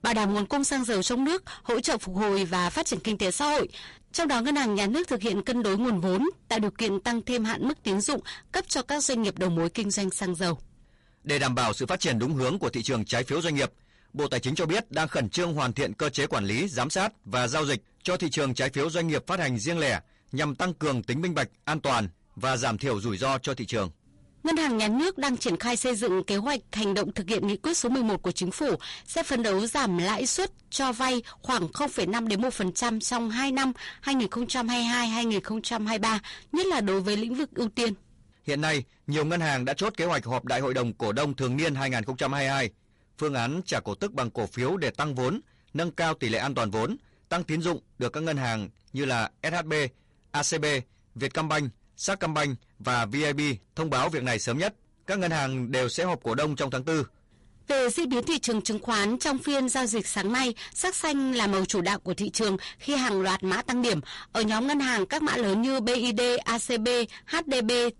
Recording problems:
distortion; heavy; 18% of the sound clipped
garbled, watery; slightly; nothing above 11 kHz

